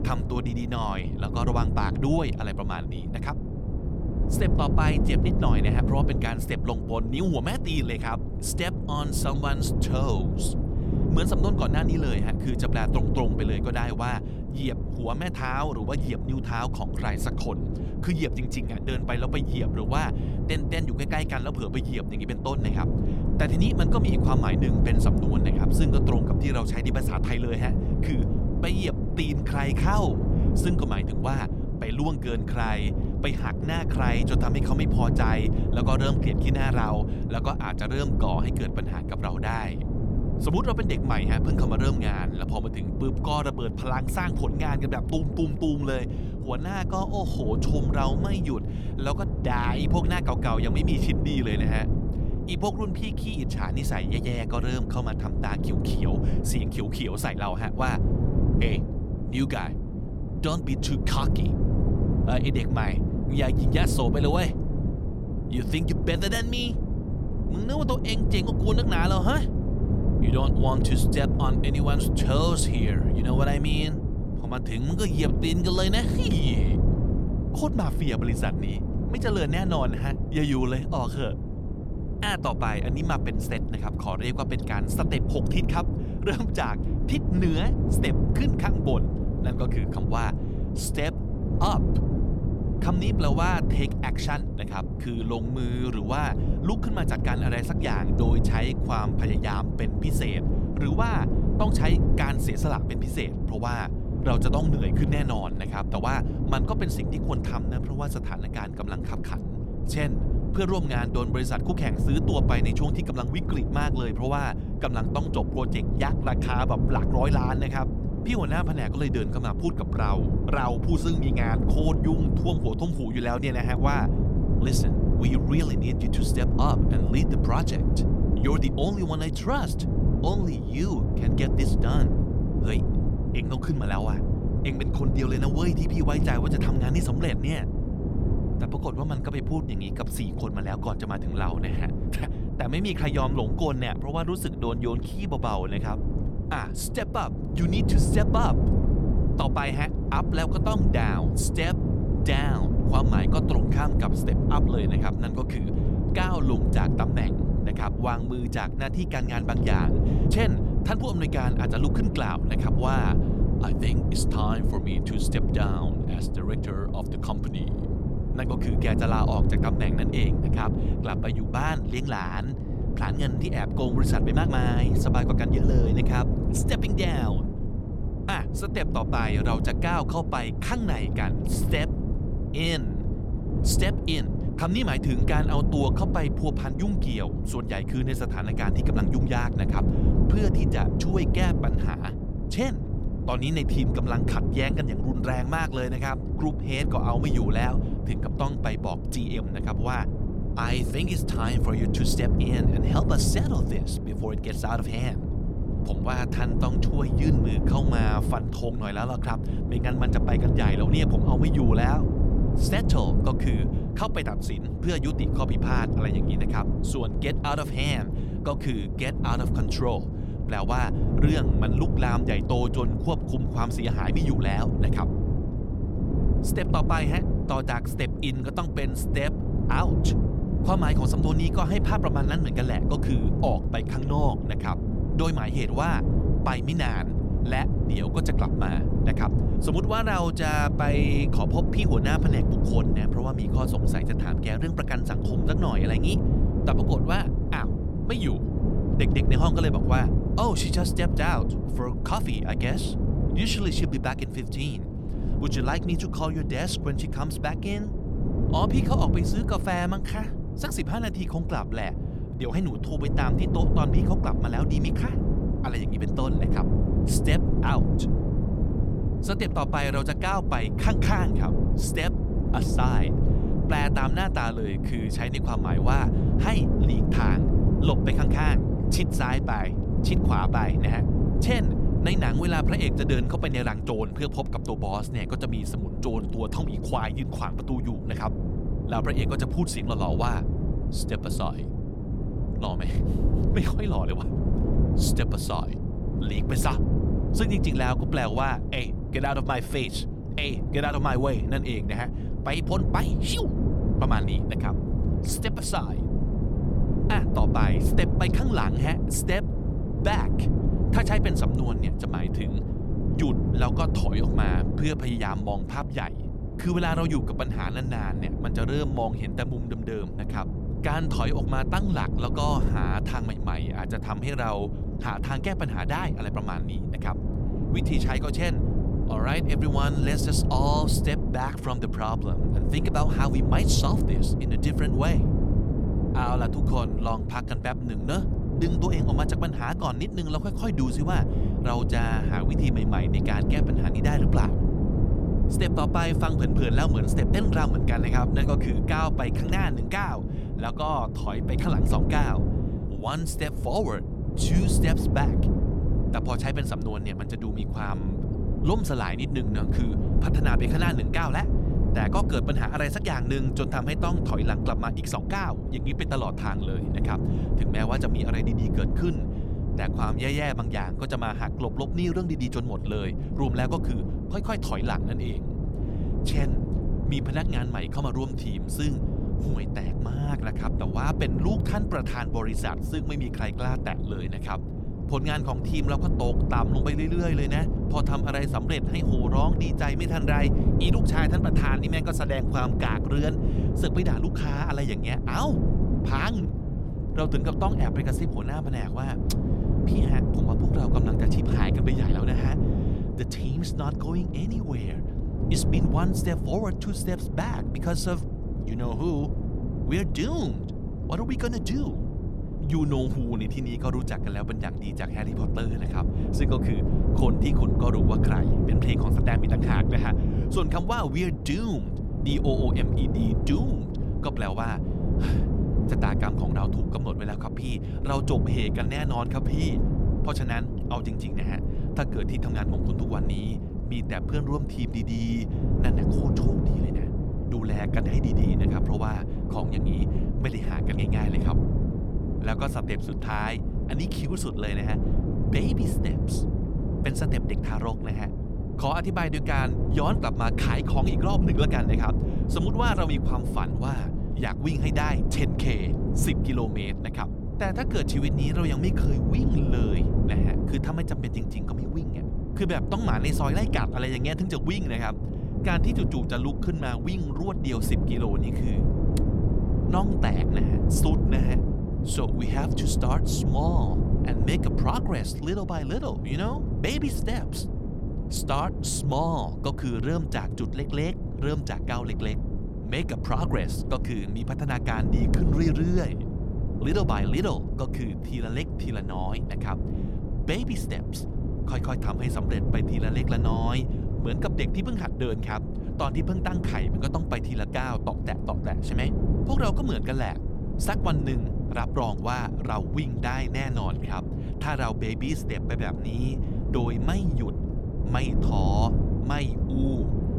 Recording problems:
wind noise on the microphone; heavy; 4 dB below the speech

